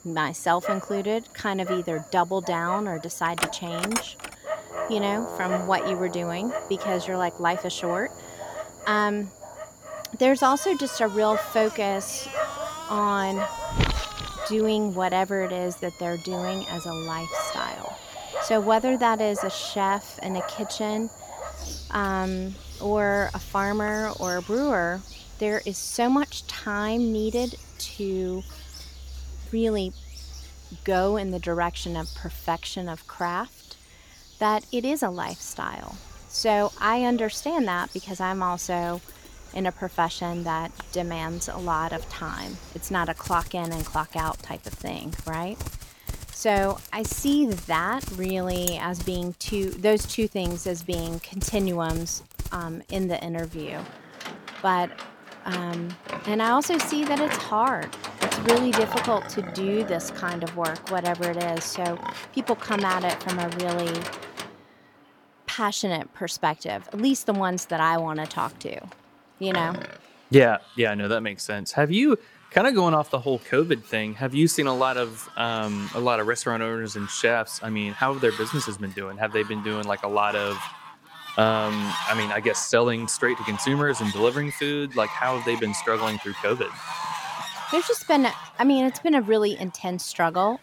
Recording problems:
animal sounds; loud; throughout; 9 dB below the speech

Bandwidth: 17.5 kHz